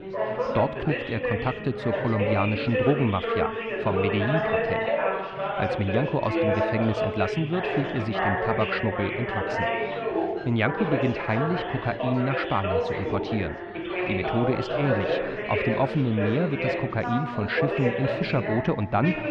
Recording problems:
muffled; slightly; fading above 3 kHz
chatter from many people; loud; throughout; as loud as the speech

